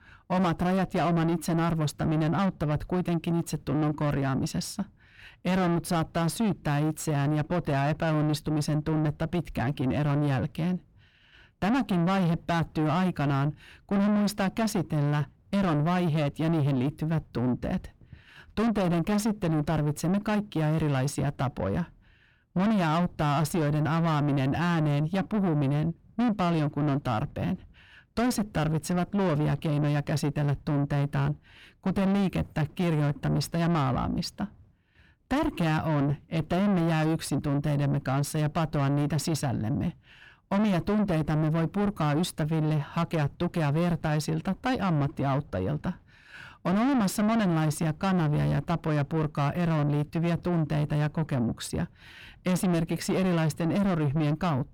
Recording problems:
distortion; heavy; 7 dB below the speech

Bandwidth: 17.5 kHz